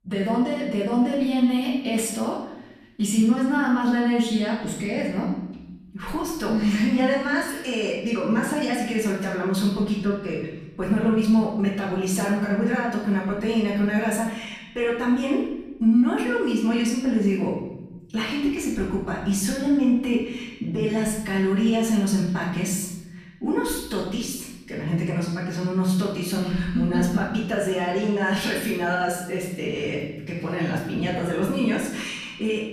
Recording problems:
off-mic speech; far
room echo; noticeable; dies away in 1.4 s

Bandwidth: 14.5 kHz